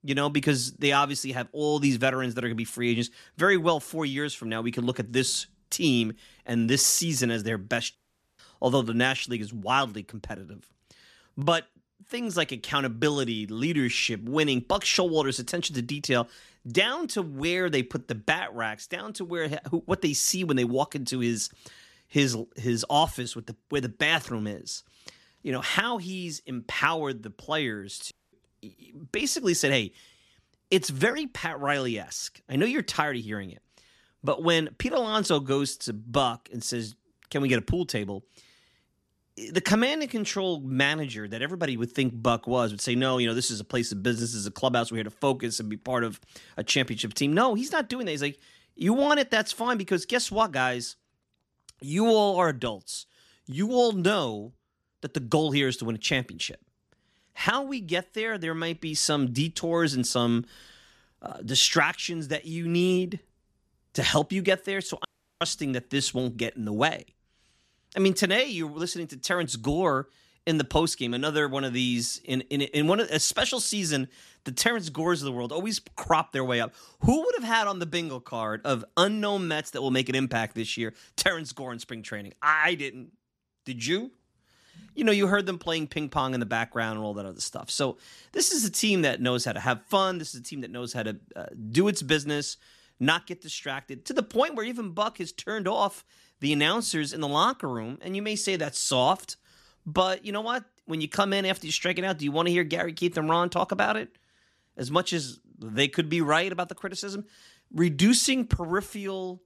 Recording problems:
audio cutting out; at 8 s, at 28 s and at 1:05

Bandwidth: 13.5 kHz